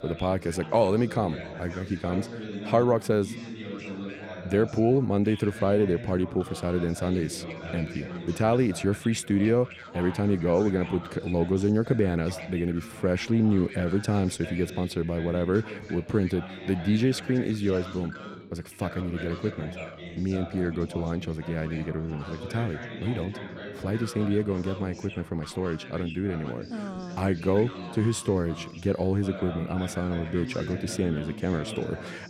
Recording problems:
background chatter; noticeable; throughout; 4 voices, 10 dB below the speech

